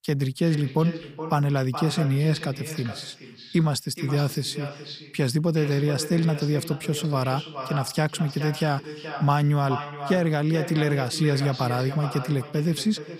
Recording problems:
echo of what is said; strong; throughout; 420 ms later, 10 dB below the speech

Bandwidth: 15 kHz